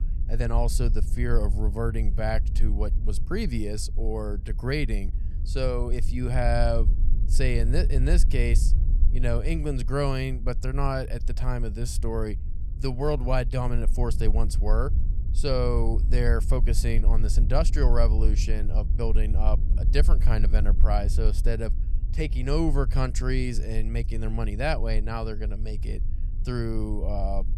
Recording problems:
low rumble; noticeable; throughout; 15 dB below the speech

